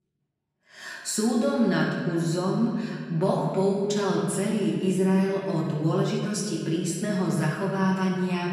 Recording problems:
off-mic speech; far
room echo; noticeable; dies away in 1.7 s

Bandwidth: 15 kHz